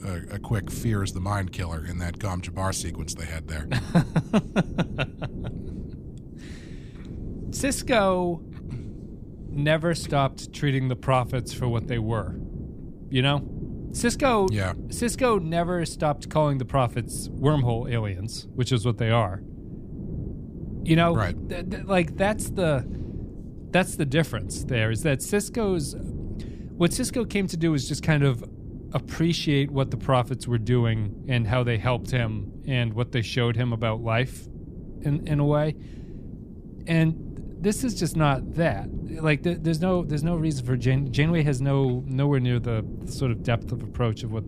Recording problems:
wind noise on the microphone; occasional gusts; 20 dB below the speech

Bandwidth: 15 kHz